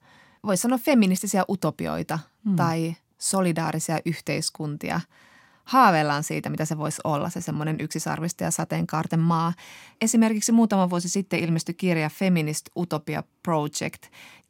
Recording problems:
none

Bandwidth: 16.5 kHz